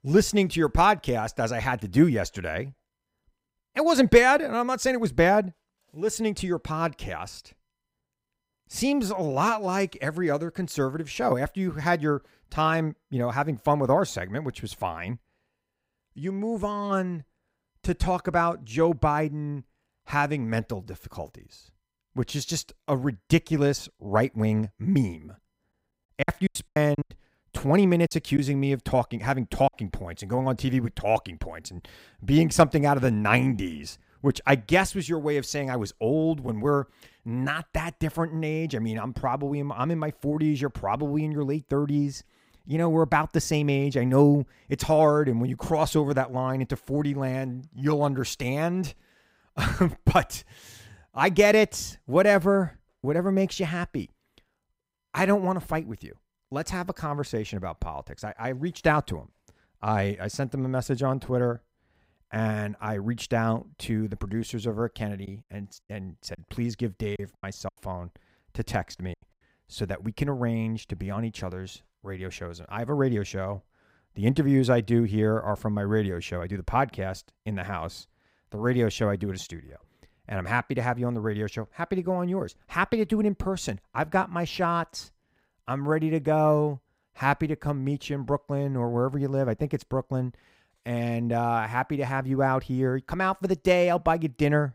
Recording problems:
choppy; very; from 26 to 30 s and from 1:05 to 1:09; 11% of the speech affected

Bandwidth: 15.5 kHz